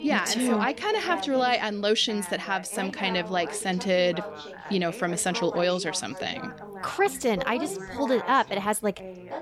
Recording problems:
background chatter; noticeable; throughout; 3 voices, 10 dB below the speech

